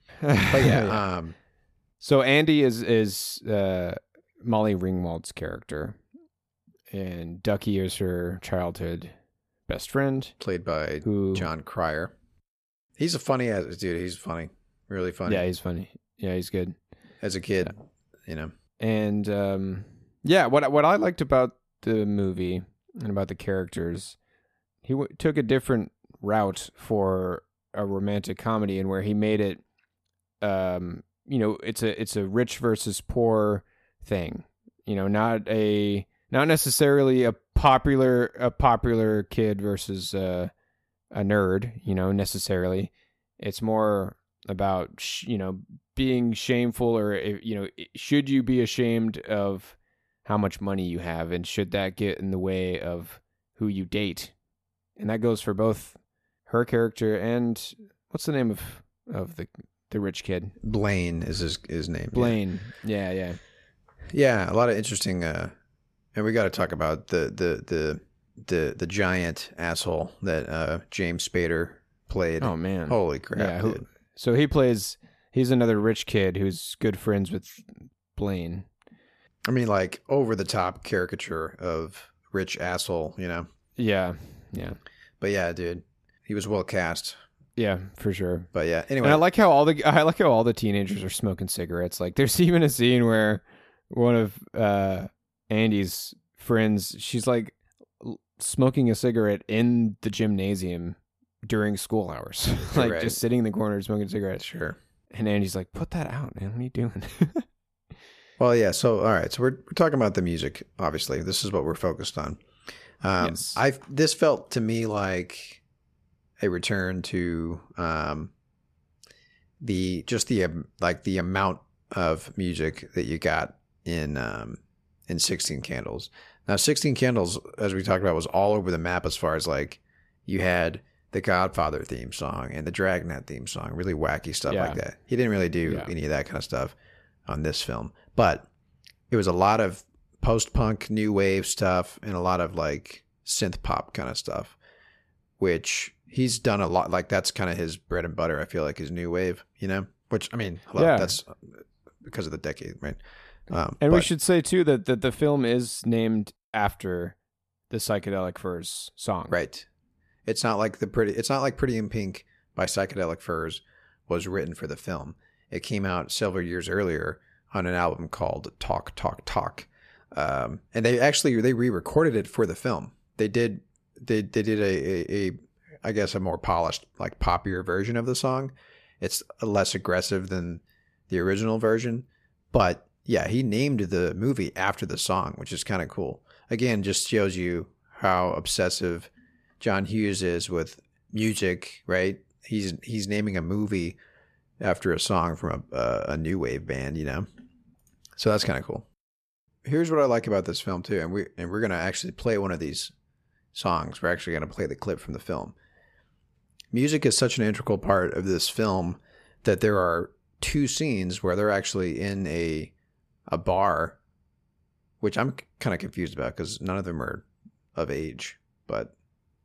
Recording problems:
none

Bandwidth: 14 kHz